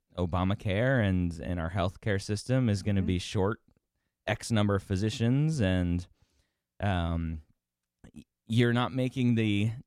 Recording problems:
none

